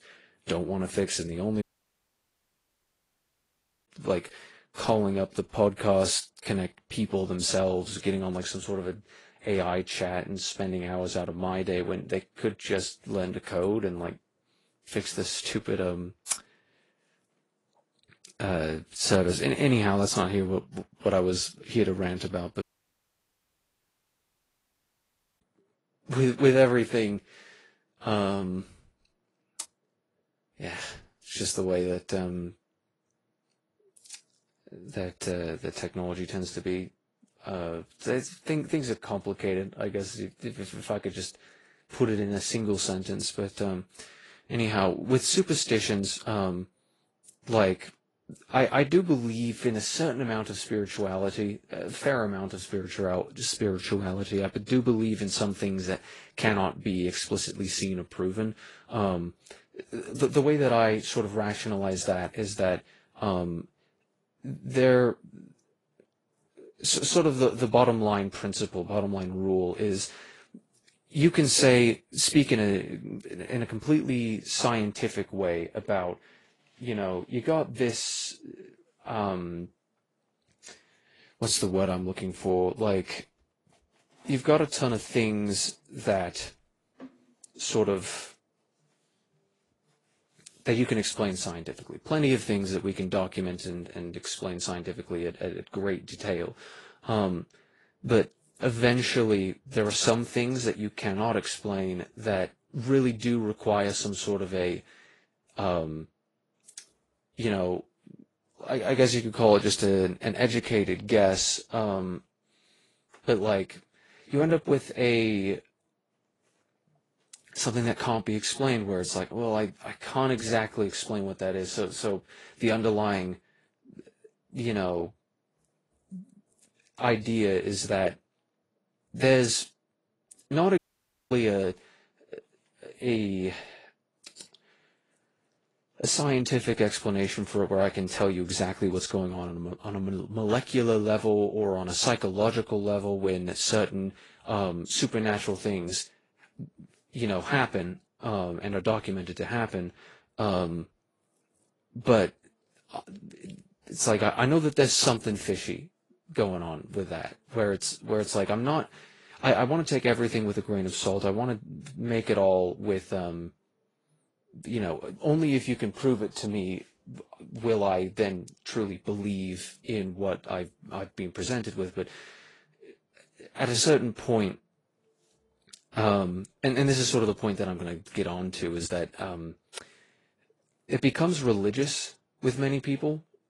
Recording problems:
garbled, watery; slightly; nothing above 10.5 kHz
audio cutting out; at 1.5 s for 2.5 s, at 23 s for 3 s and at 2:11 for 0.5 s

